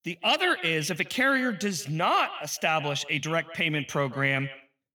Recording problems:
echo of what is said; noticeable; throughout; 150 ms later, 15 dB below the speech

